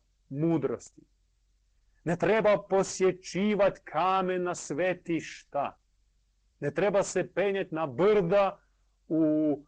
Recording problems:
distortion; slight; 10 dB below the speech
garbled, watery; slightly; nothing above 8 kHz
uneven, jittery; strongly; from 2 to 8.5 s

